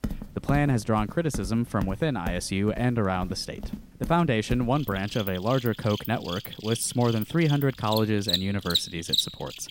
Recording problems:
animal sounds; loud; throughout; 6 dB below the speech

